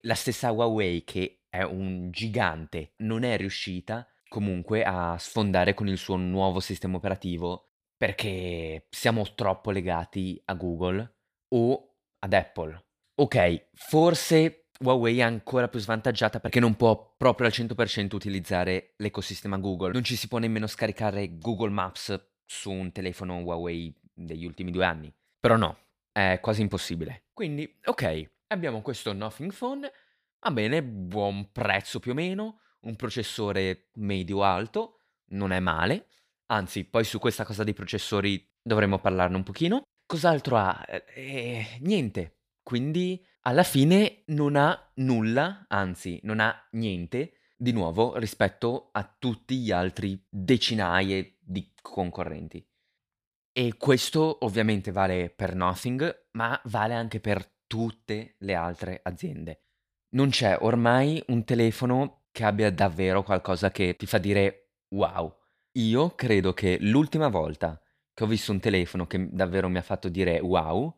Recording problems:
none

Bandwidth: 15 kHz